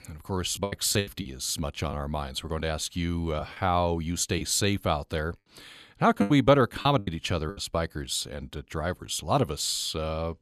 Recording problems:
choppy; very; 6% of the speech affected

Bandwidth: 13.5 kHz